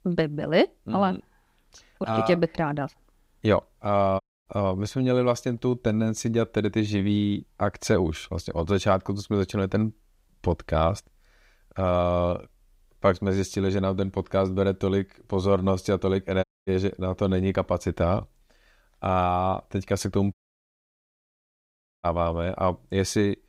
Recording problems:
audio cutting out; at 4 s, at 16 s and at 20 s for 1.5 s

